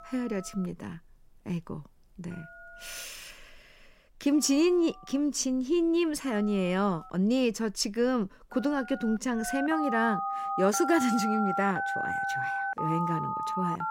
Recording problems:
alarms or sirens; loud; throughout; 3 dB below the speech

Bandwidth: 16 kHz